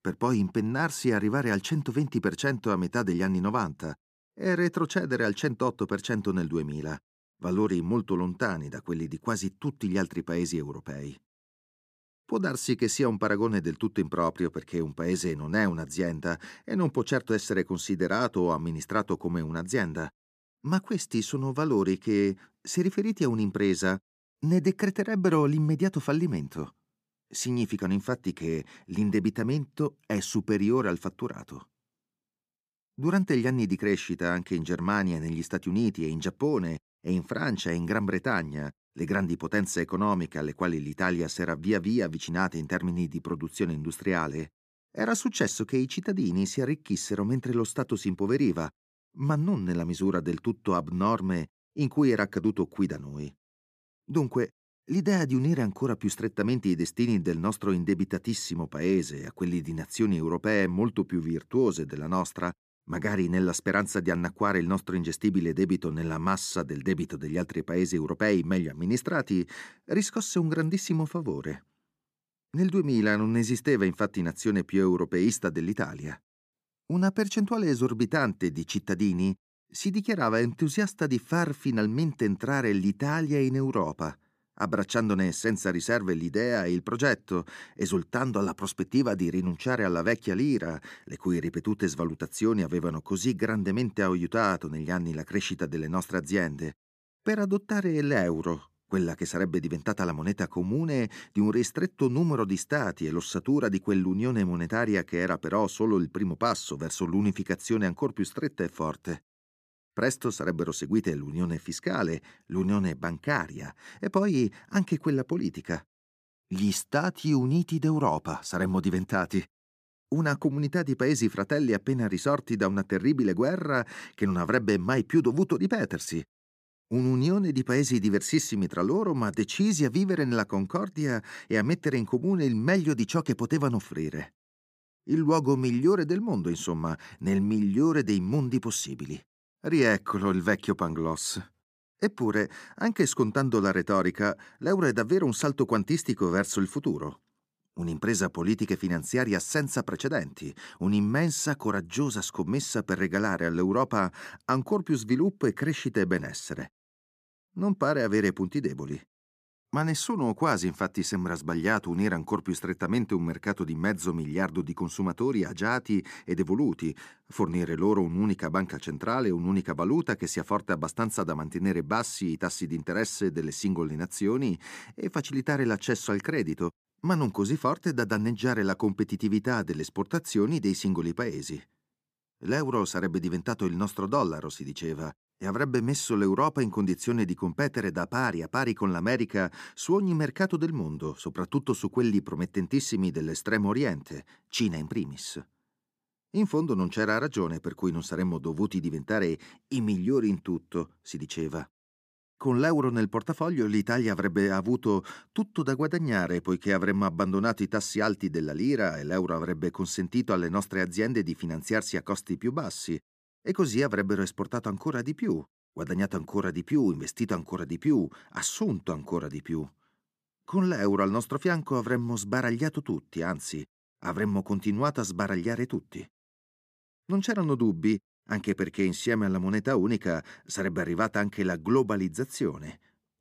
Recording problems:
none

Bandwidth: 14.5 kHz